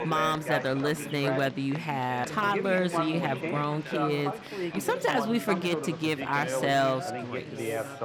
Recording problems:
background chatter; loud; throughout; 3 voices, 6 dB below the speech
crowd noise; noticeable; throughout; 15 dB below the speech

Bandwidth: 18 kHz